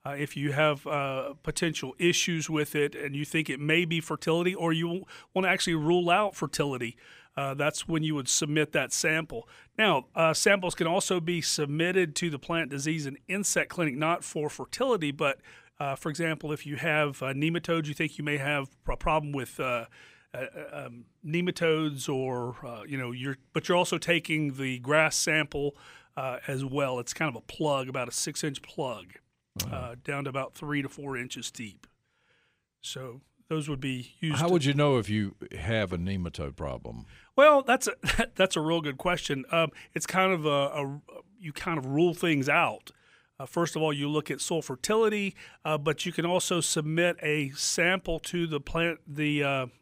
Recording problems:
none

